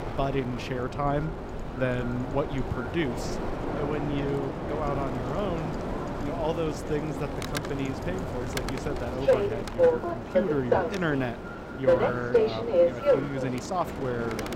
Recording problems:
echo of what is said; noticeable; throughout; 310 ms later, 15 dB below the speech
train or aircraft noise; very loud; throughout; 2 dB above the speech
wind noise on the microphone; occasional gusts; 10 dB below the speech

